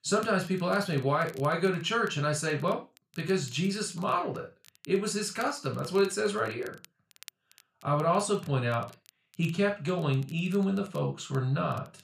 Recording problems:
off-mic speech; far
room echo; slight; dies away in 0.3 s
crackle, like an old record; faint; 25 dB below the speech

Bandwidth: 14.5 kHz